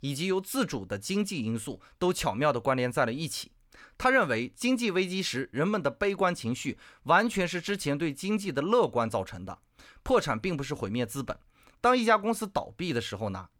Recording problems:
none

